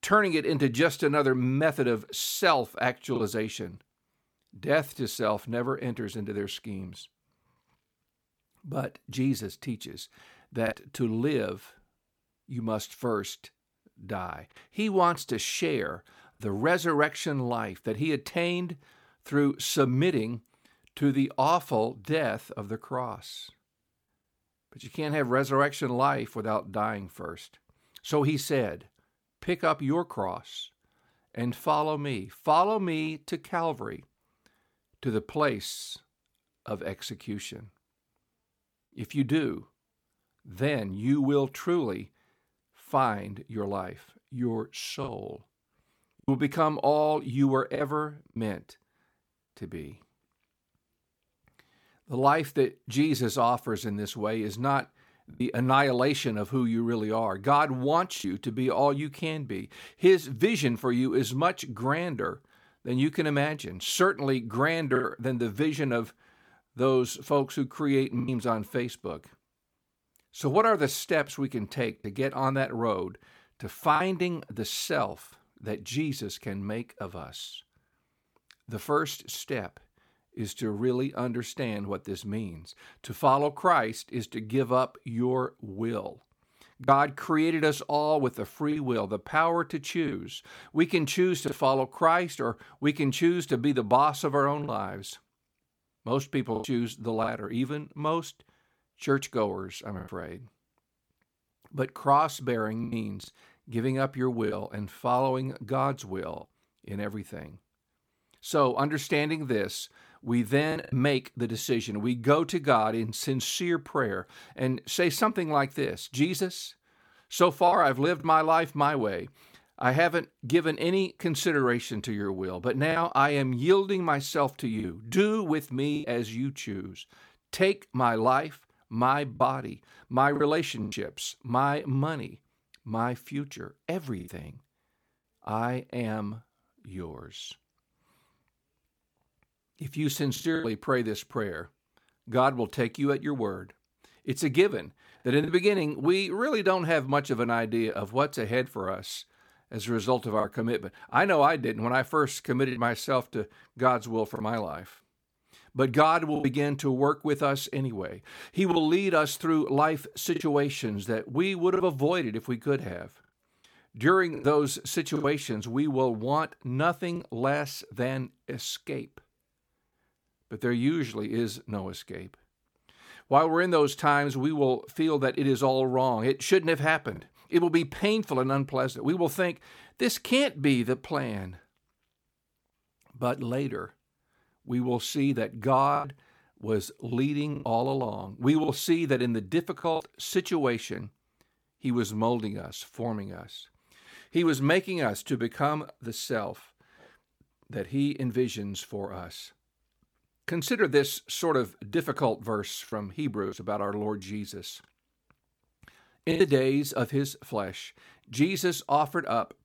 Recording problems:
choppy; occasionally; 2% of the speech affected

